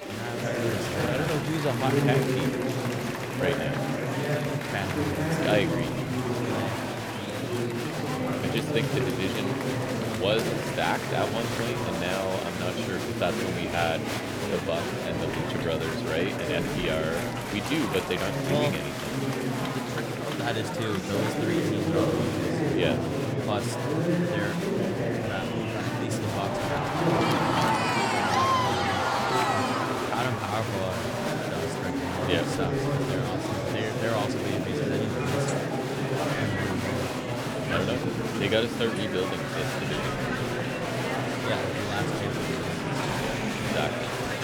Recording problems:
murmuring crowd; very loud; throughout; 4 dB above the speech

